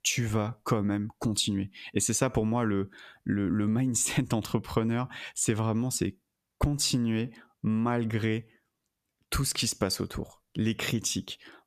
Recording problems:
squashed, flat; heavily

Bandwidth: 14.5 kHz